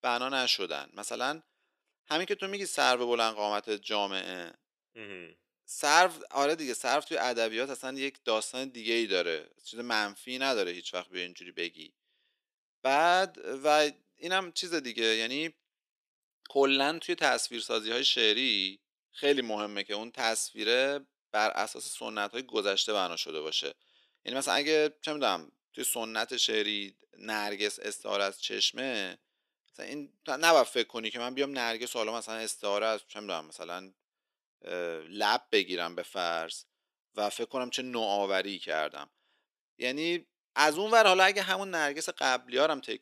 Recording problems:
thin; somewhat; fading below 350 Hz

